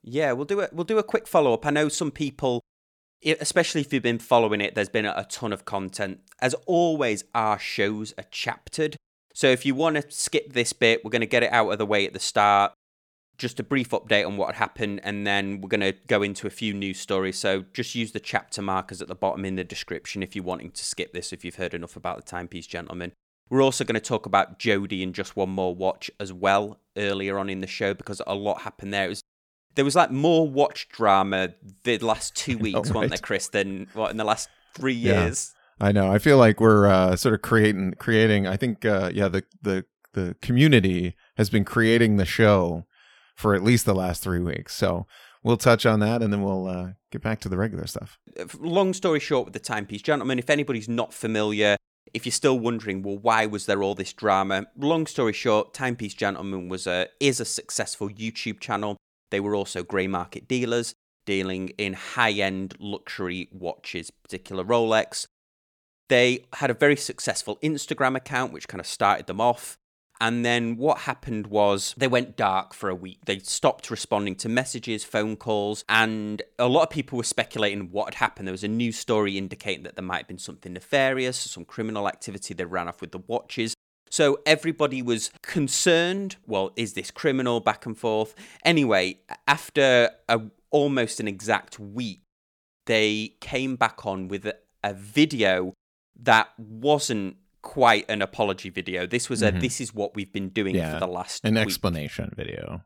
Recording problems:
none

